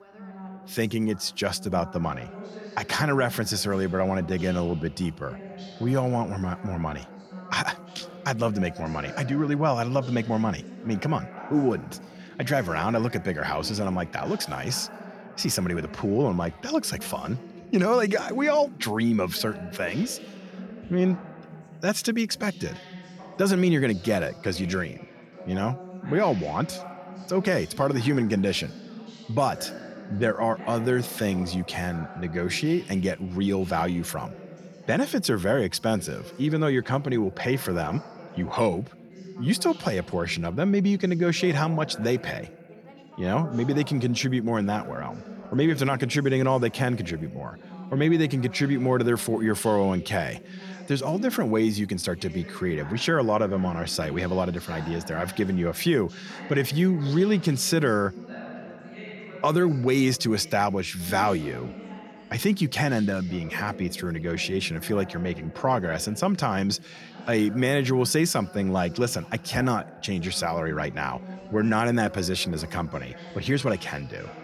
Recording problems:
background chatter; noticeable; throughout; 3 voices, 15 dB below the speech

